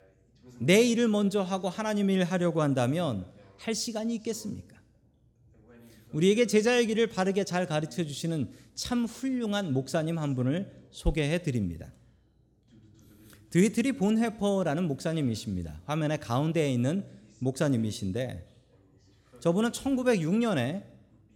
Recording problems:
voice in the background; faint; throughout; 30 dB below the speech

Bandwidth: 18.5 kHz